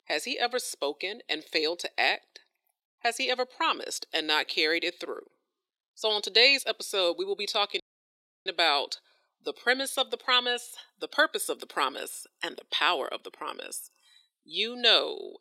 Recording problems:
thin; somewhat; fading below 350 Hz
audio cutting out; at 8 s for 0.5 s

